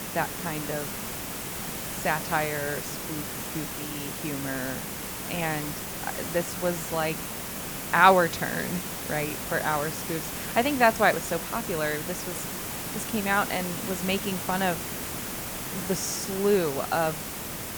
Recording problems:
hiss; loud; throughout; 5 dB below the speech

